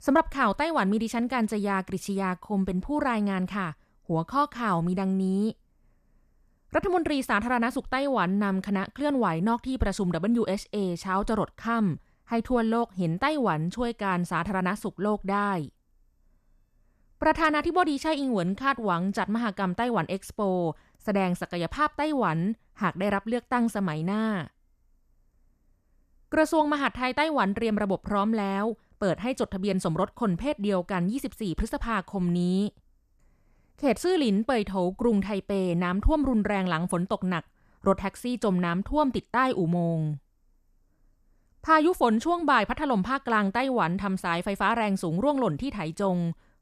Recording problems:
none

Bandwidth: 14.5 kHz